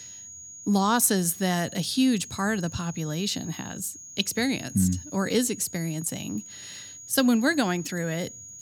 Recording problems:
high-pitched whine; noticeable; throughout; 6.5 kHz, 15 dB below the speech

